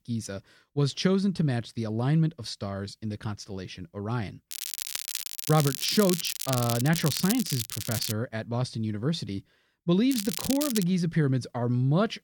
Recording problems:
crackling; loud; from 4.5 to 8 s and at 10 s; 4 dB below the speech

